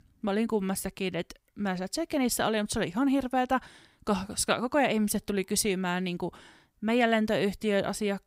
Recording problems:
none

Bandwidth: 15.5 kHz